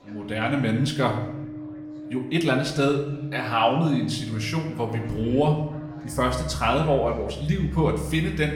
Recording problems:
room echo; slight; dies away in 0.8 s
off-mic speech; somewhat distant
background music; noticeable; throughout; 15 dB below the speech
chatter from many people; faint; throughout; 25 dB below the speech

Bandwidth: 17 kHz